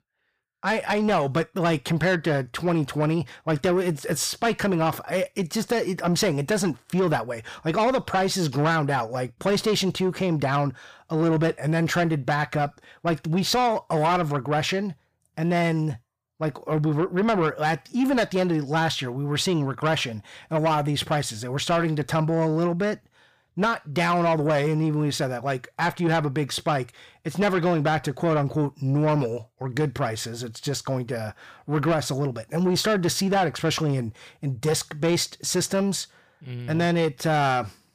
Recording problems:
distortion; slight; 10 dB below the speech

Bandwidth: 15 kHz